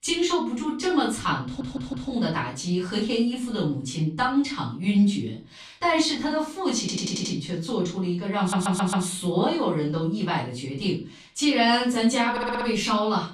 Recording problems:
off-mic speech; far
room echo; slight; dies away in 0.3 s
audio stuttering; 4 times, first at 1.5 s

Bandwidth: 14.5 kHz